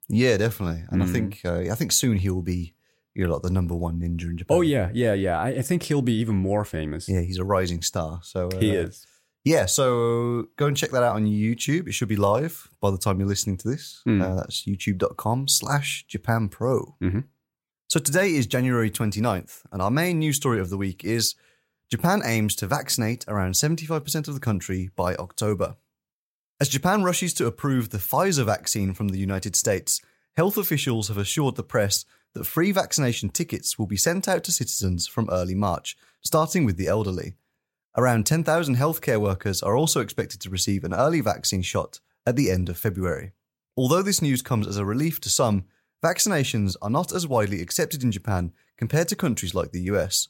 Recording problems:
none

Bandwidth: 16 kHz